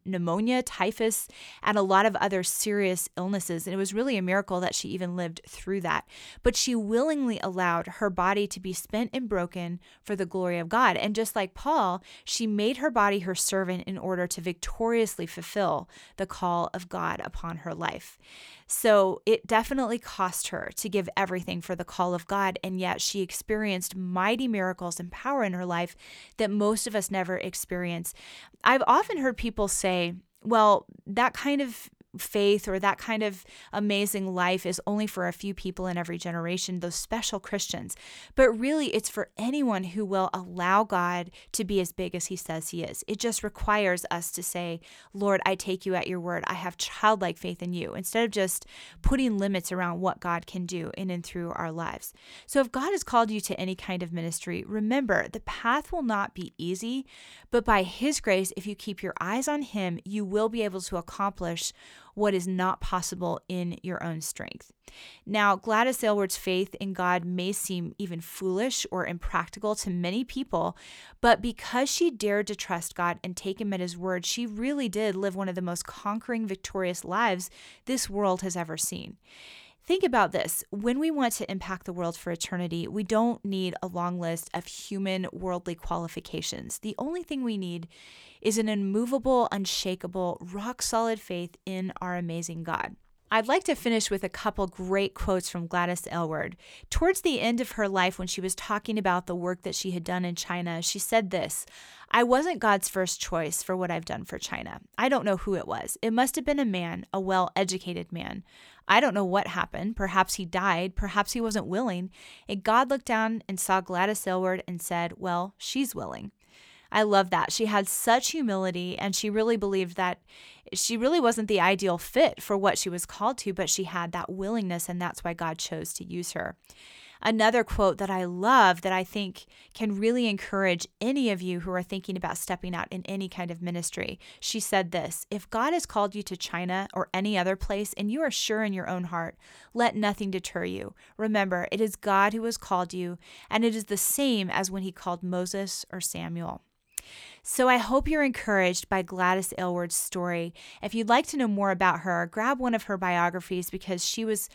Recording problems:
none

